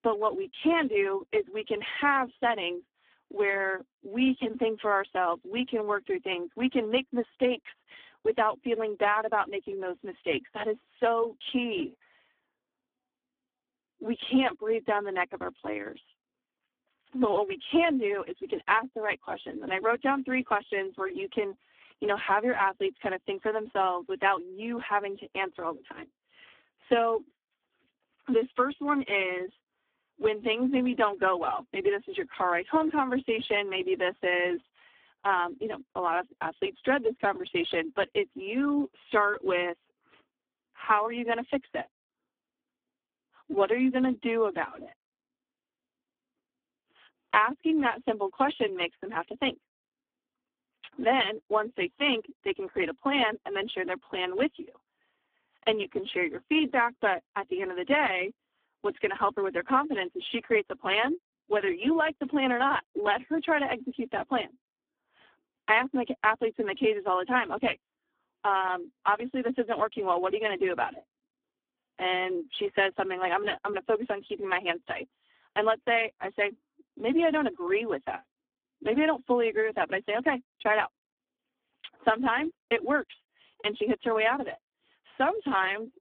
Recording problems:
phone-call audio; poor line

